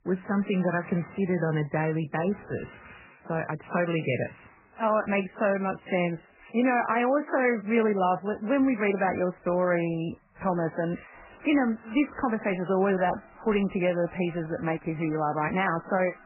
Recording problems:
garbled, watery; badly; nothing above 3 kHz
household noises; faint; throughout; 25 dB below the speech

